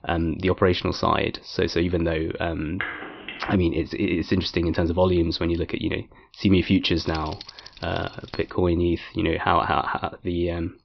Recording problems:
high frequencies cut off; noticeable; nothing above 5.5 kHz
phone ringing; noticeable; at 3 s; peak 7 dB below the speech
jangling keys; faint; from 7 to 8.5 s; peak 15 dB below the speech

